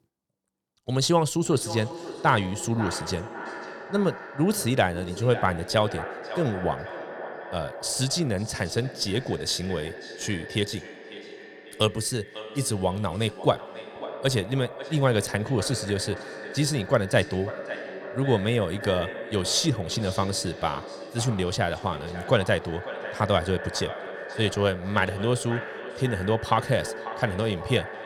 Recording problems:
echo of what is said; strong; throughout; 540 ms later, 10 dB below the speech

